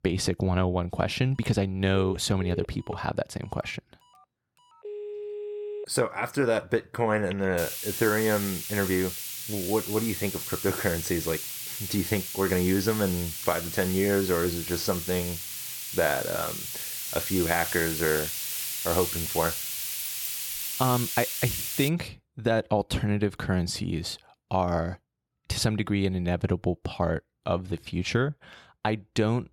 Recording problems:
hiss; loud; from 7.5 to 22 s; 3 dB below the speech
phone ringing; noticeable; from 1.5 to 7.5 s; peak 7 dB below the speech
jangling keys; noticeable; from 20 to 21 s; peak 10 dB below the speech

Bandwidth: 17.5 kHz